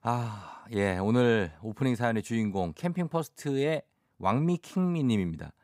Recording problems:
none

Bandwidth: 15.5 kHz